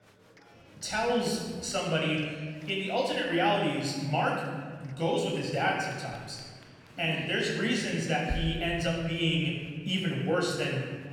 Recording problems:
off-mic speech; far
room echo; noticeable; dies away in 1.3 s
chatter from many people; faint; throughout; 25 dB below the speech

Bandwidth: 17 kHz